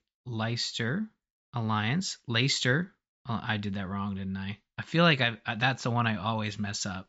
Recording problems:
high frequencies cut off; noticeable; nothing above 8 kHz

